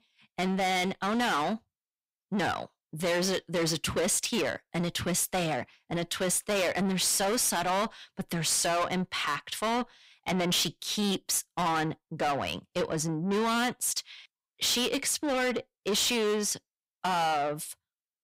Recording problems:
distortion; heavy; 5 dB below the speech

